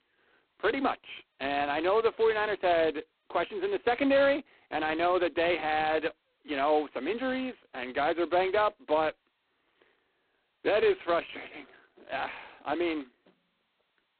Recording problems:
phone-call audio; poor line; nothing above 4 kHz

